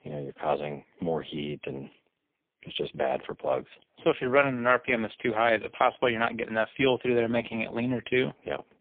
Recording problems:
phone-call audio; poor line; nothing above 3.5 kHz

